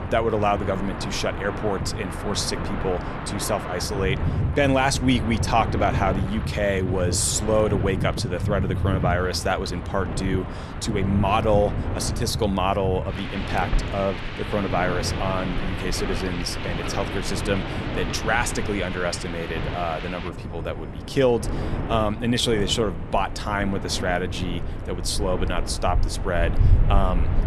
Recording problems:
wind in the background; loud; throughout; 3 dB below the speech

